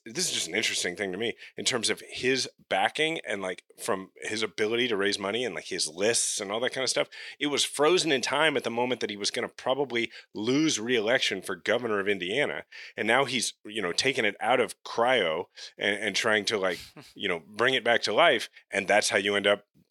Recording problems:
thin; somewhat; fading below 350 Hz

